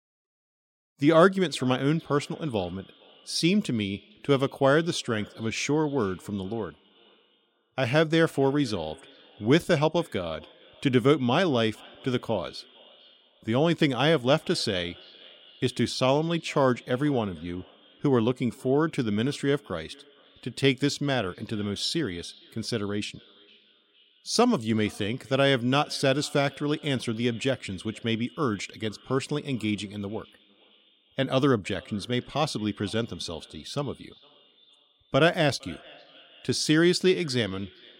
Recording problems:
echo of what is said; faint; throughout; 460 ms later, 25 dB below the speech

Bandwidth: 16 kHz